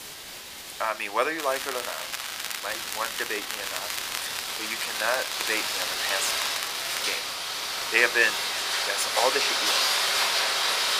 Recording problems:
thin; very; fading below 800 Hz
echo of what is said; faint; throughout; 540 ms later, 20 dB below the speech
rain or running water; very loud; throughout; 2 dB above the speech
crackling; loud; from 1.5 to 5.5 s and from 5.5 to 7 s; 5 dB below the speech
hiss; noticeable; throughout; 10 dB below the speech

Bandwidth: 15 kHz